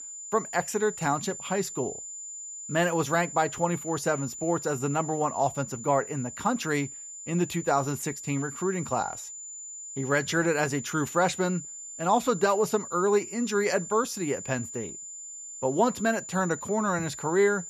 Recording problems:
high-pitched whine; loud; throughout; 7 kHz, 10 dB below the speech

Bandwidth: 14.5 kHz